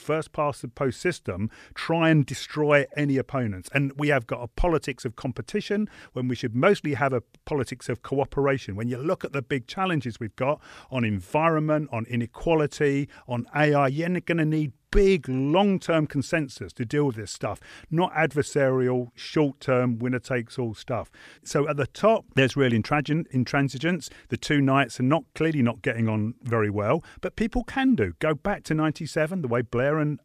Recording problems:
none

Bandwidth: 14.5 kHz